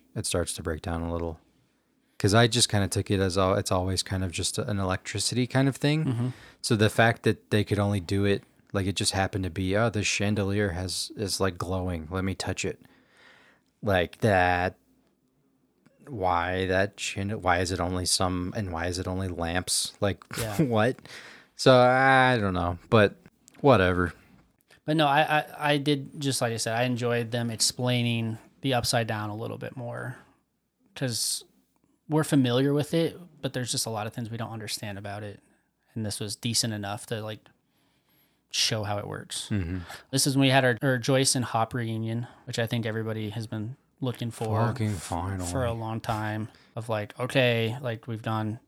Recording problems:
none

